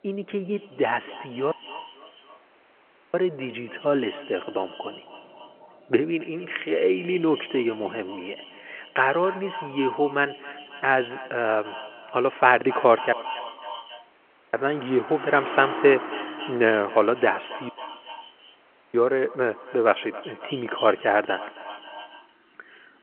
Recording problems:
echo of what is said; noticeable; throughout; 270 ms later, 15 dB below the speech
phone-call audio
traffic noise; noticeable; throughout; 15 dB below the speech
audio cutting out; at 1.5 s for 1.5 s, at 13 s for 1.5 s and at 18 s for 1.5 s

